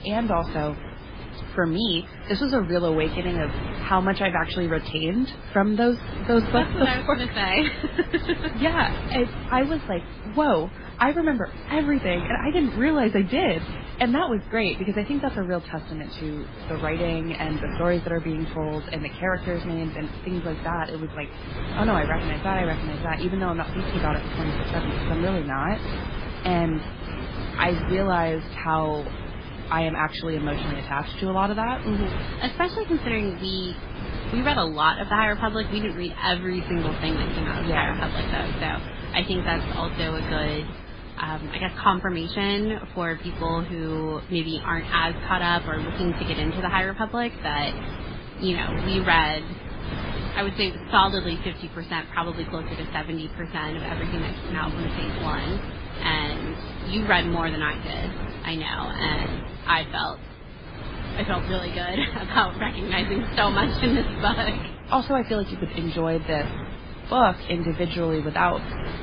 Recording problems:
garbled, watery; badly; nothing above 4.5 kHz
wind noise on the microphone; occasional gusts; 10 dB below the speech

